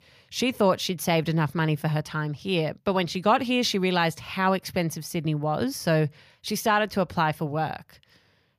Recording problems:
none

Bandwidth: 15 kHz